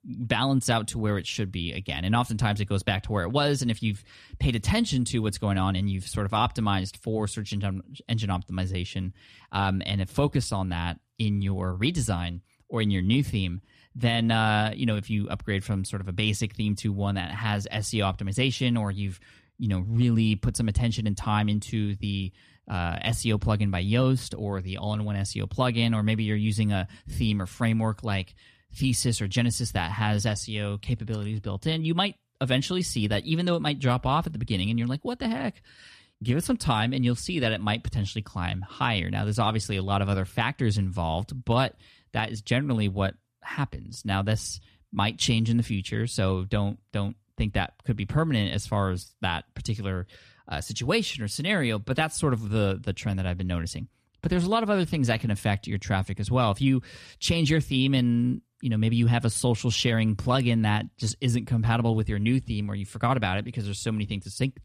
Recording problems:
none

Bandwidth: 14 kHz